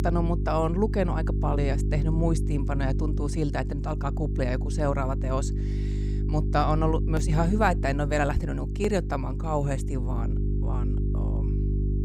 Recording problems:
electrical hum; noticeable; throughout; 50 Hz, 10 dB below the speech

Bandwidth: 15.5 kHz